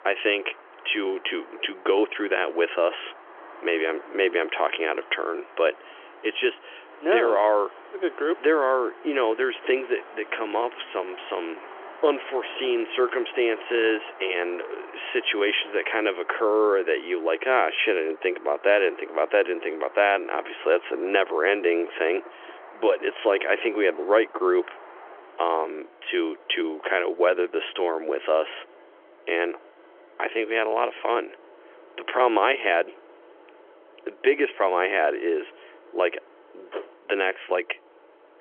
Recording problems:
phone-call audio; nothing above 3.5 kHz
traffic noise; faint; throughout; 20 dB below the speech

